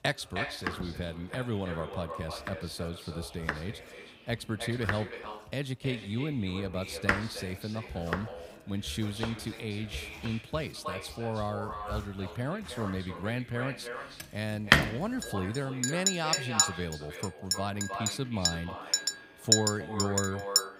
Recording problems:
echo of what is said; strong; throughout; 310 ms later, 7 dB below the speech
household noises; very loud; throughout; 5 dB above the speech
voice in the background; noticeable; throughout; 20 dB below the speech

